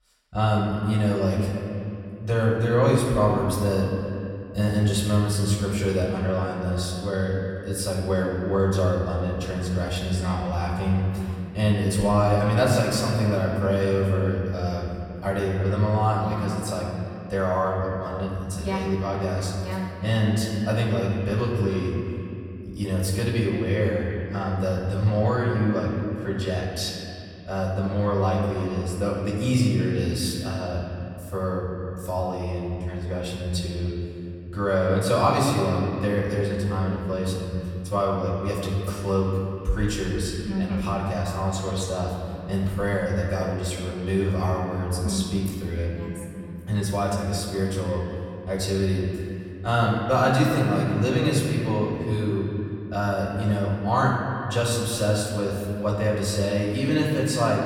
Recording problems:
off-mic speech; far
echo of what is said; noticeable; throughout; 330 ms later, 15 dB below the speech
room echo; noticeable; dies away in 2.1 s

